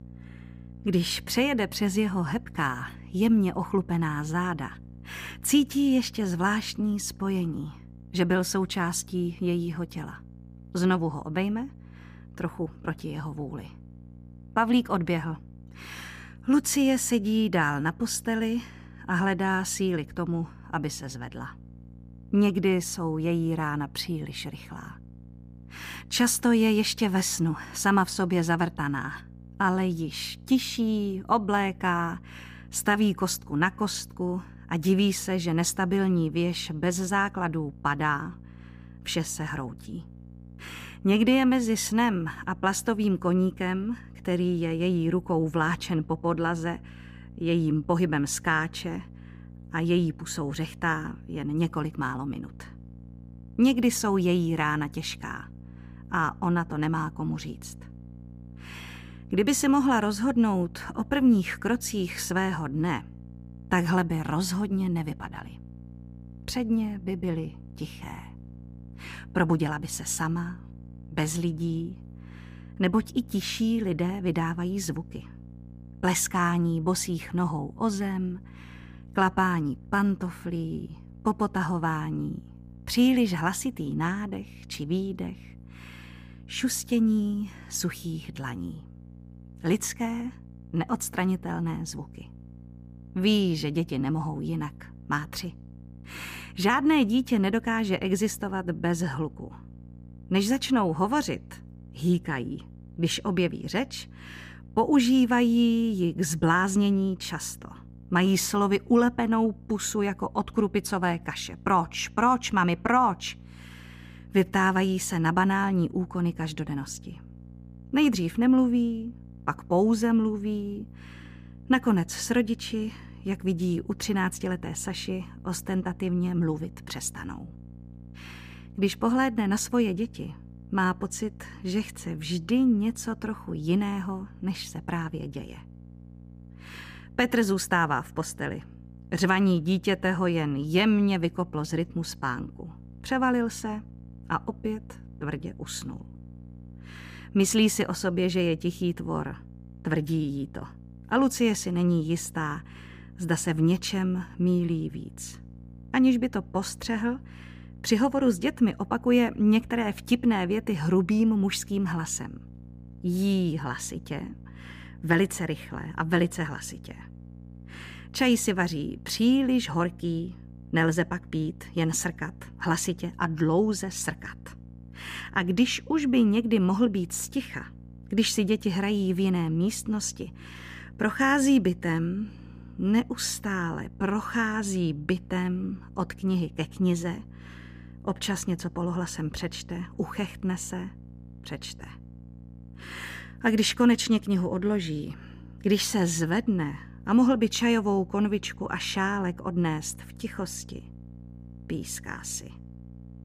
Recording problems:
electrical hum; faint; throughout; 60 Hz, 25 dB below the speech

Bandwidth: 15 kHz